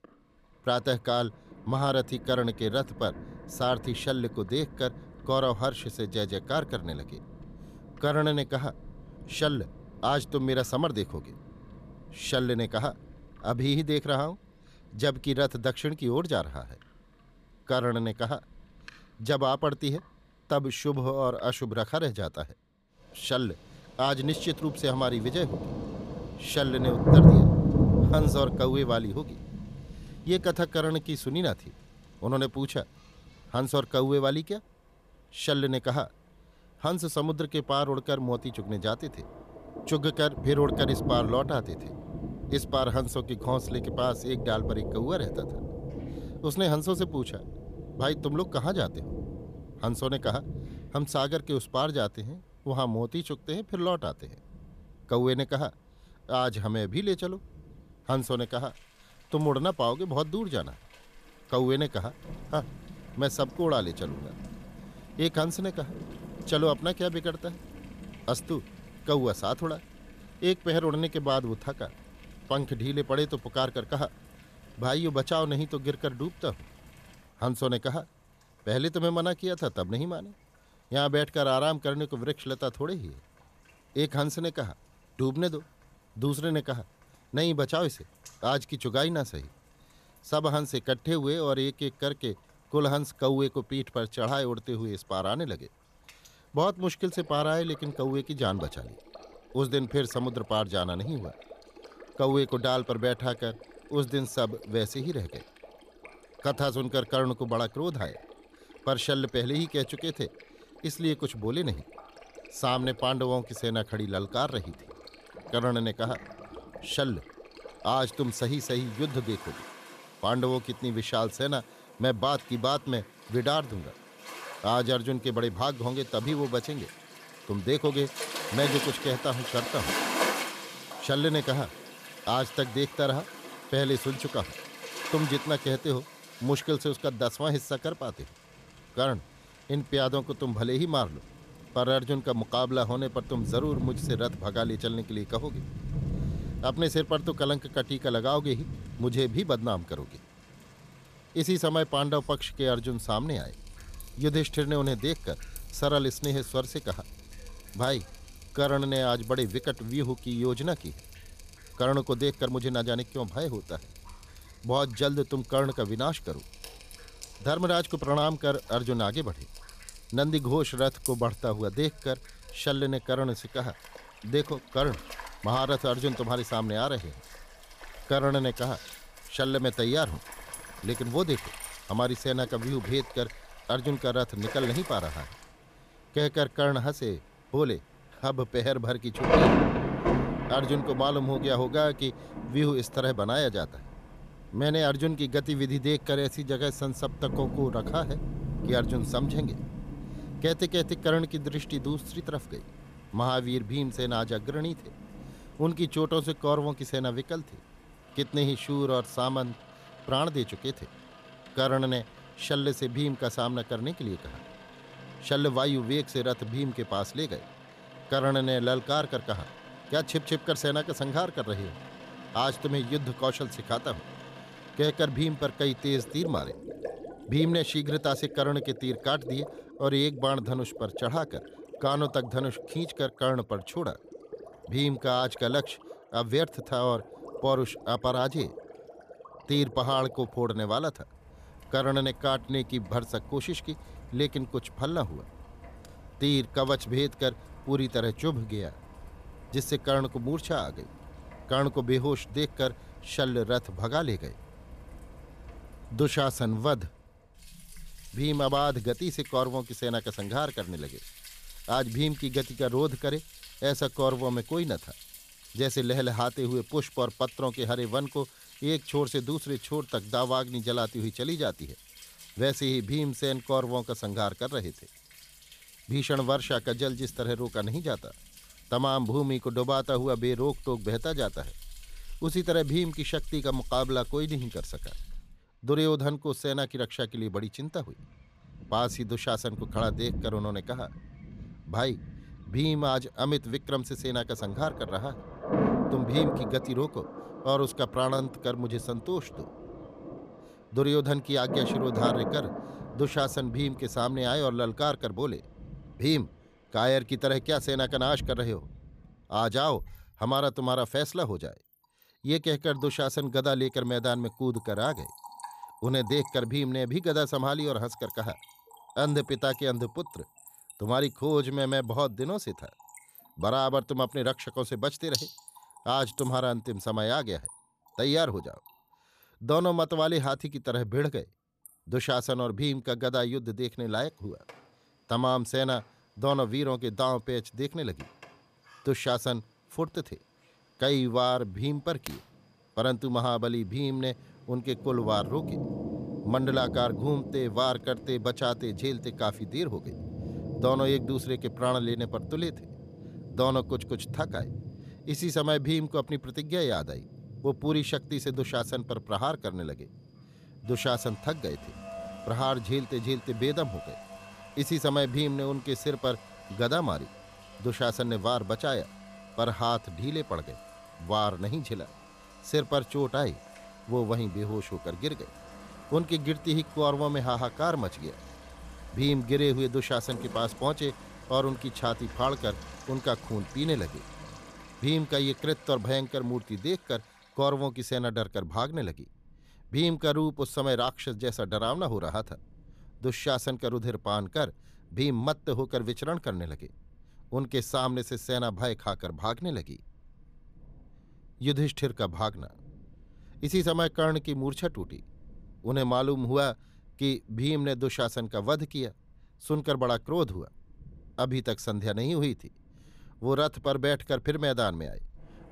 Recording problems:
rain or running water; loud; throughout; 8 dB below the speech

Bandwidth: 14.5 kHz